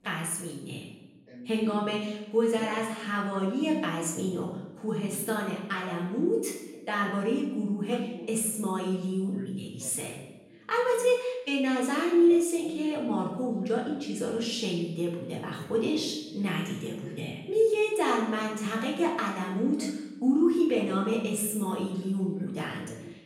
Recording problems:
off-mic speech; far
room echo; noticeable; dies away in 0.8 s
voice in the background; faint; throughout; 20 dB below the speech

